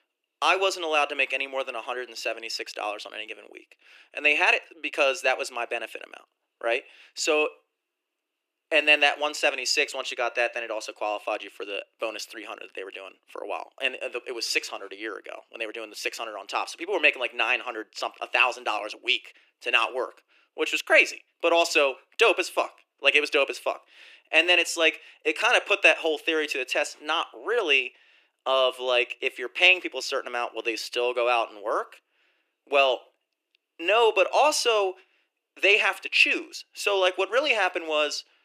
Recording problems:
thin; very; fading below 300 Hz

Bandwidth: 14.5 kHz